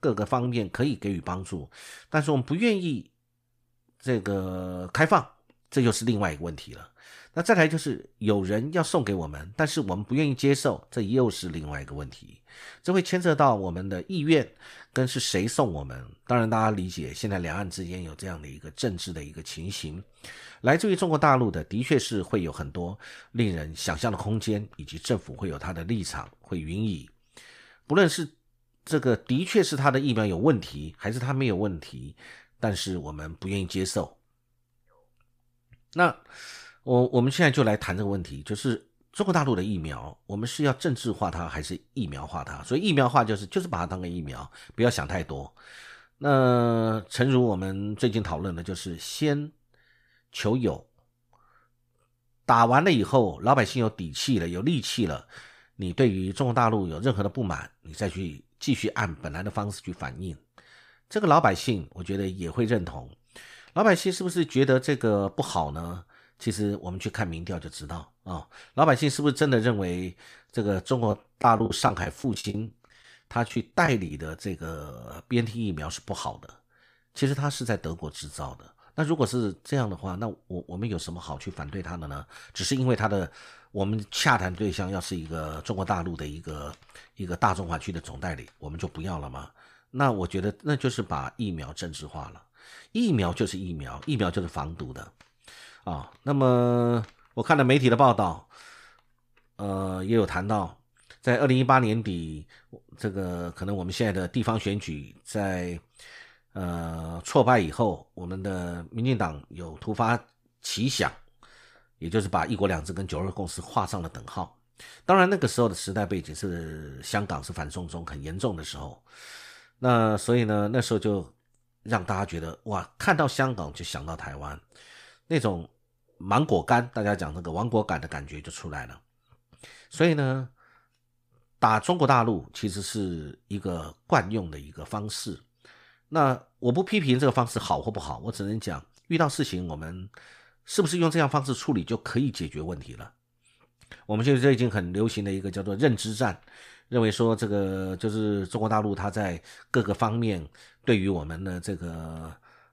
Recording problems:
choppy; very; from 1:11 to 1:14; 18% of the speech affected

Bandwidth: 15 kHz